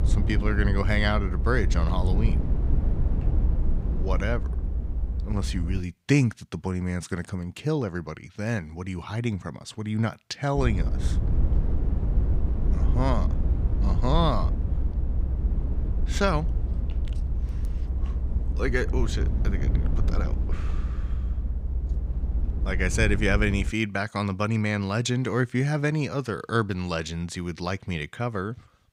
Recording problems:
low rumble; noticeable; until 6 s and from 11 to 24 s; 10 dB below the speech

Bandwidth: 15.5 kHz